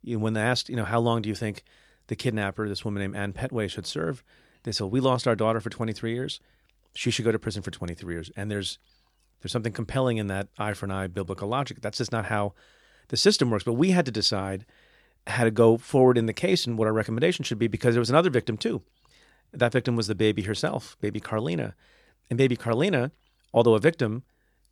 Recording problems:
none

